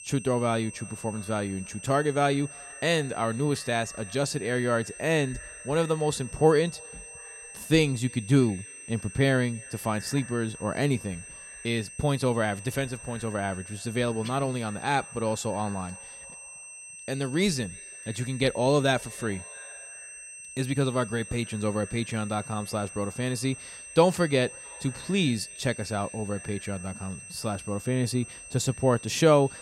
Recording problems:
echo of what is said; faint; throughout; 320 ms later, 25 dB below the speech
high-pitched whine; noticeable; throughout; 8.5 kHz, 15 dB below the speech

